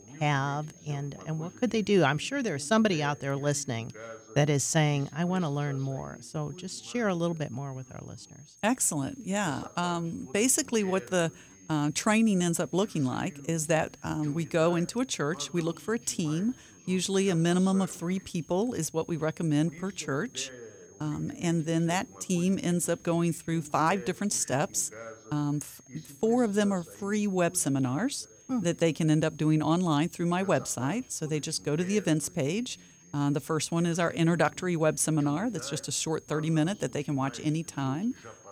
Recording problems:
high-pitched whine; faint; throughout; 6.5 kHz, 25 dB below the speech
voice in the background; faint; throughout; 20 dB below the speech

